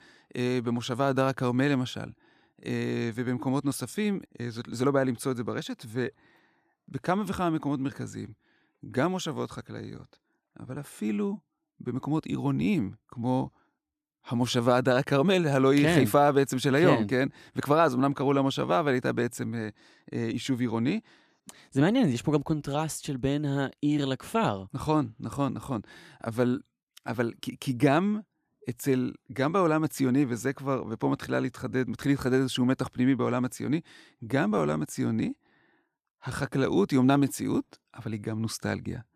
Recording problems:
none

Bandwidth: 14.5 kHz